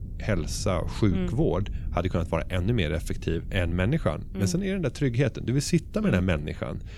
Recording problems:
low rumble; faint; throughout; 20 dB below the speech

